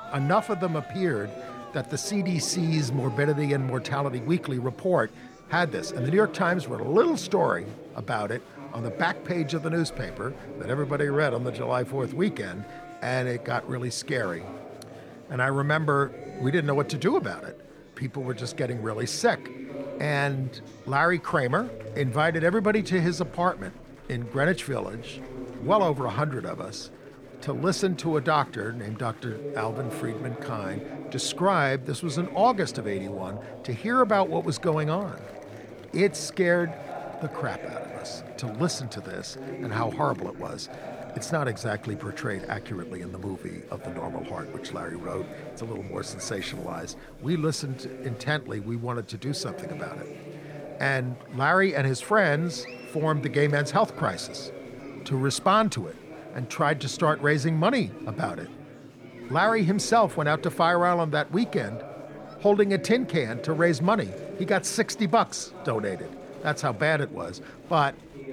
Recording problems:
chatter from many people; noticeable; throughout; 15 dB below the speech

